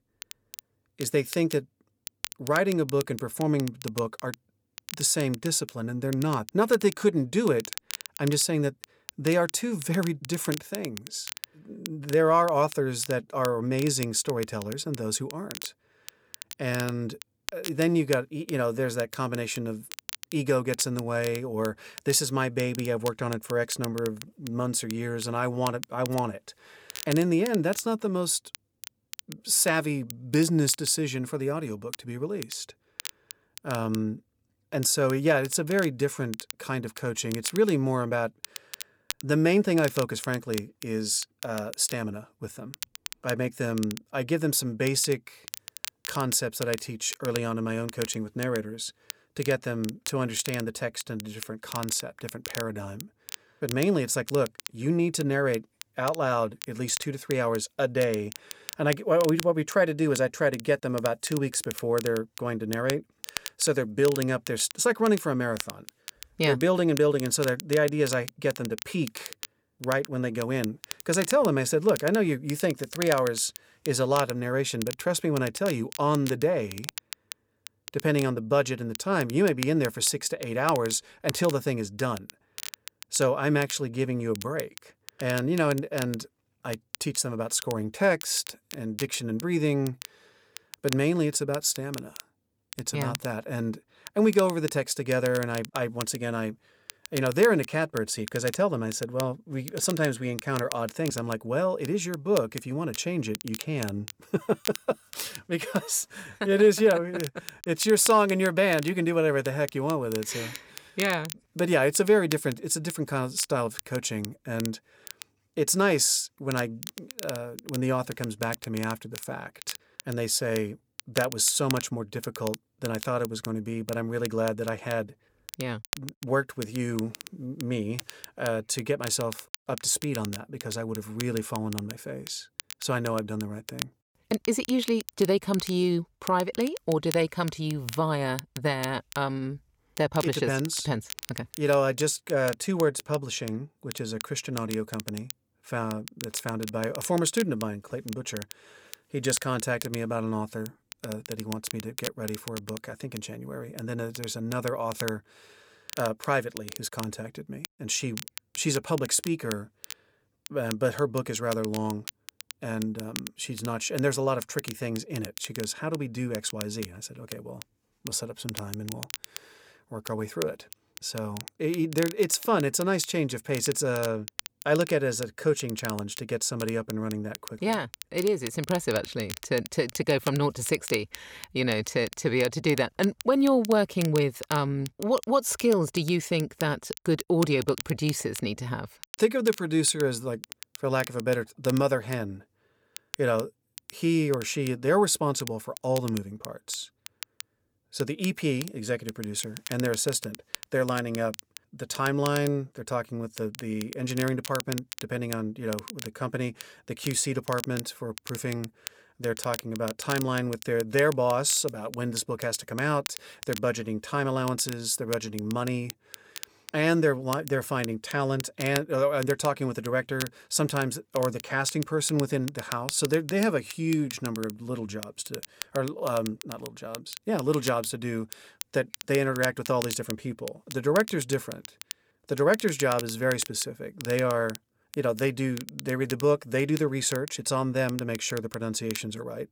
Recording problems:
crackle, like an old record; noticeable; 15 dB below the speech

